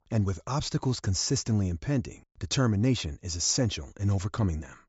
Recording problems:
high frequencies cut off; noticeable; nothing above 8 kHz

